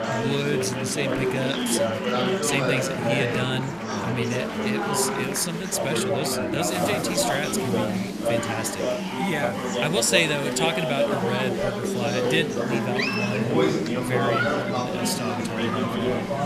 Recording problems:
chatter from many people; very loud; throughout; 2 dB above the speech

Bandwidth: 14.5 kHz